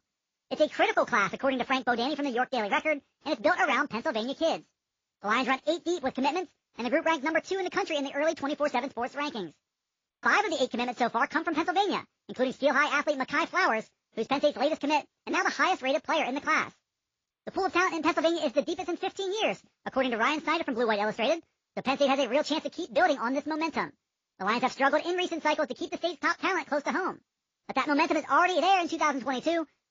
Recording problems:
wrong speed and pitch; too fast and too high; 1.5 times normal speed
garbled, watery; slightly; nothing above 6 kHz

